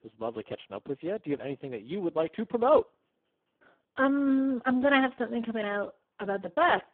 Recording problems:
phone-call audio; poor line

